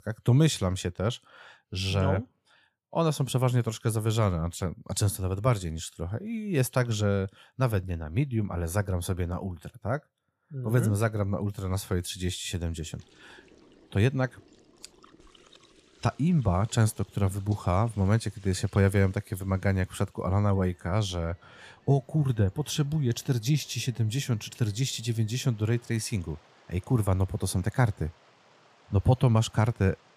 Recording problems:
rain or running water; faint; from 13 s on; 30 dB below the speech

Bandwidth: 15 kHz